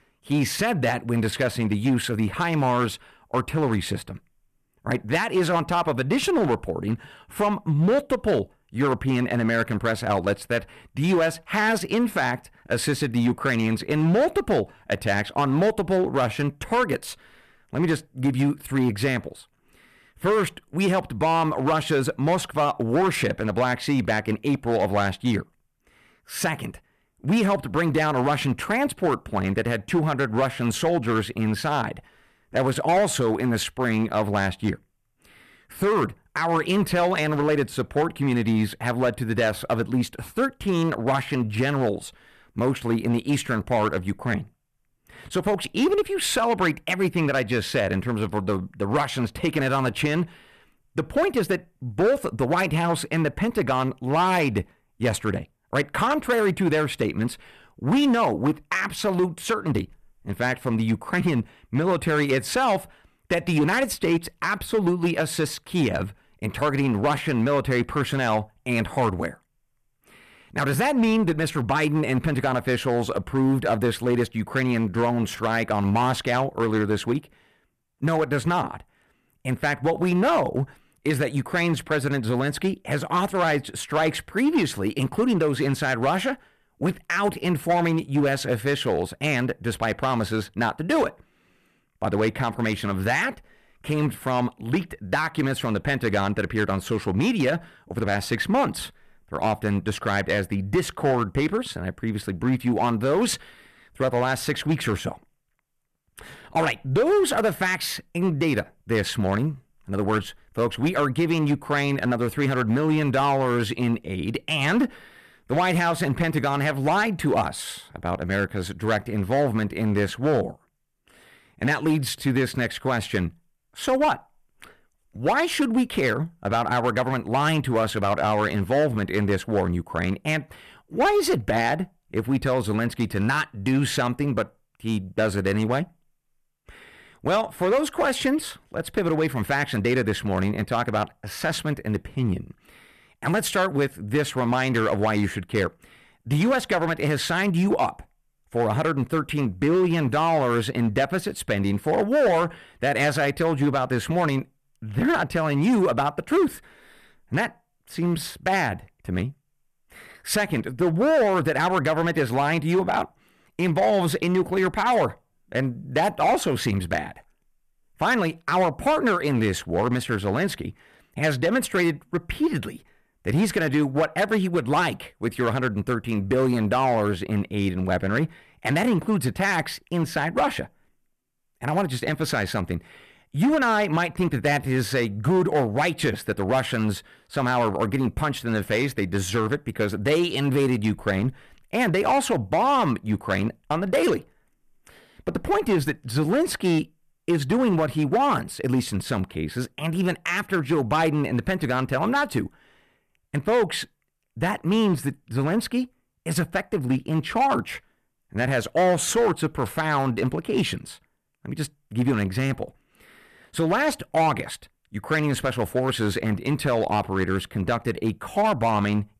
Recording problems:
distortion; slight; 6% of the sound clipped

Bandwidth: 14 kHz